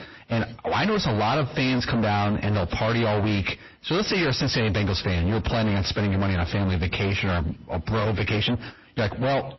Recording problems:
distortion; heavy; 5 dB below the speech
garbled, watery; slightly; nothing above 5.5 kHz

